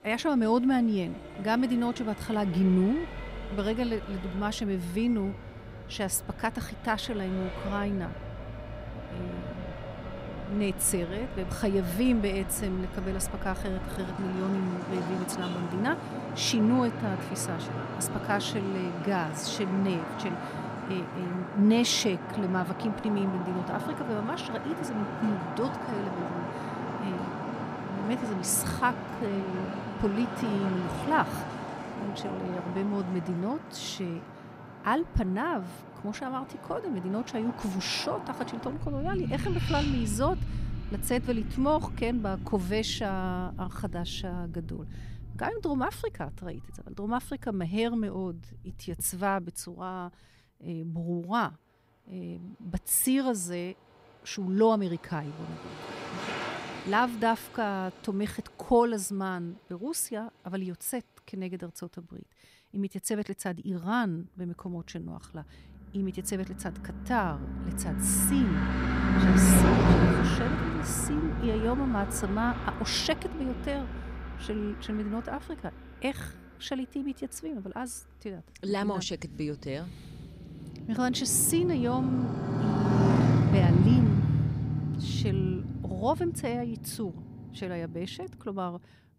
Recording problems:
traffic noise; loud; throughout; 2 dB below the speech

